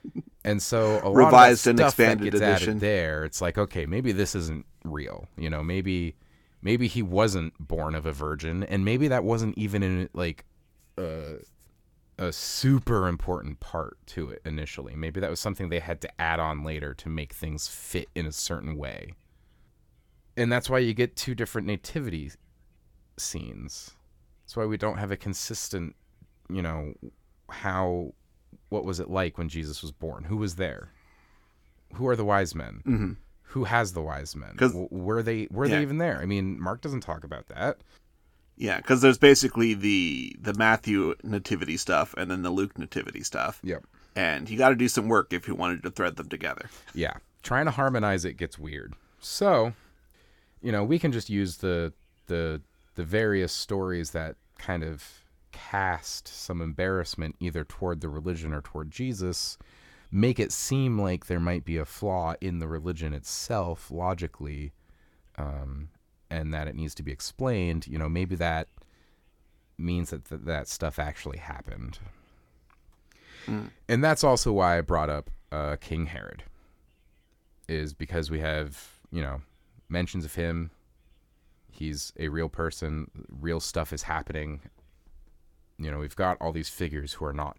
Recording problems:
none

